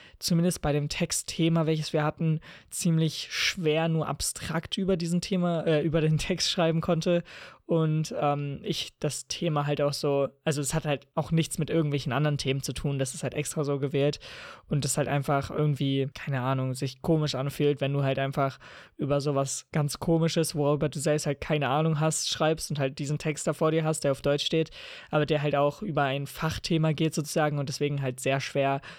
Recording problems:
none

